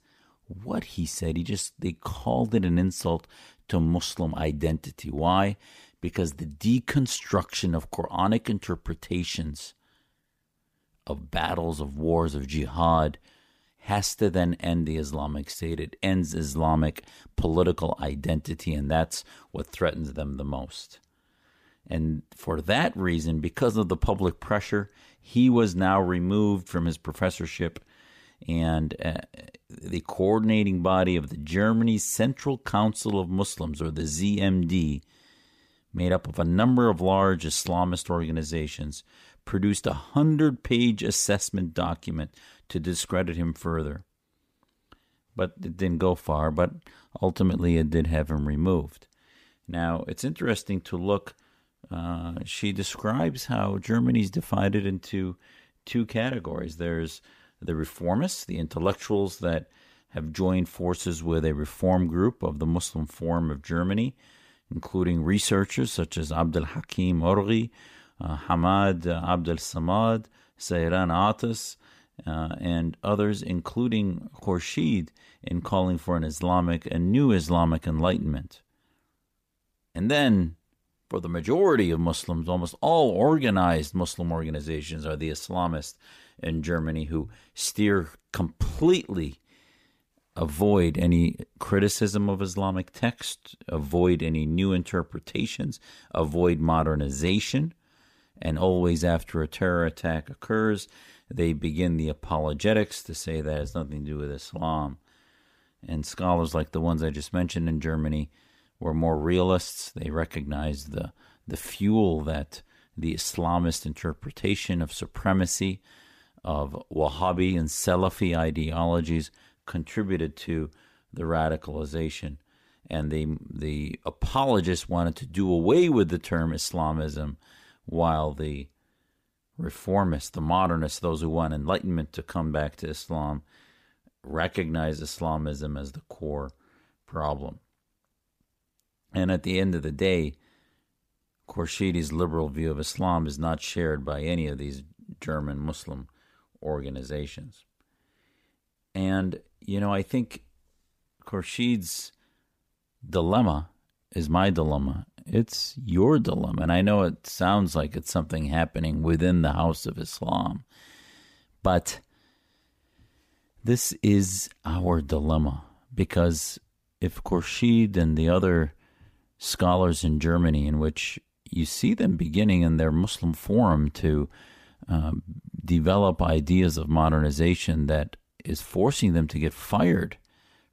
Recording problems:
none

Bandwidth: 15 kHz